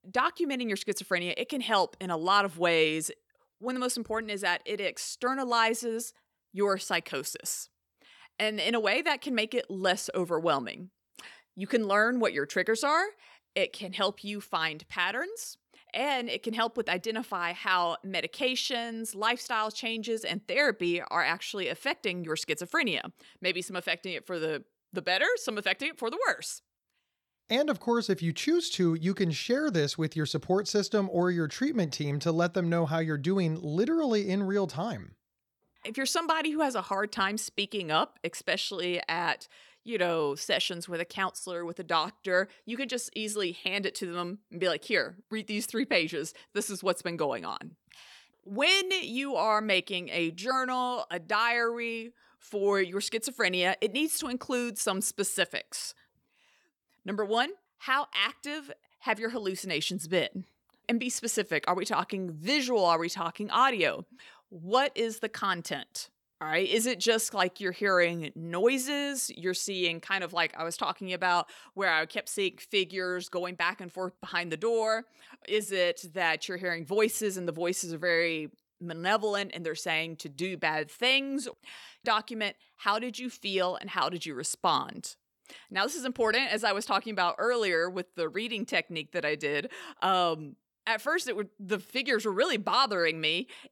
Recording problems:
none

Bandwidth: 18.5 kHz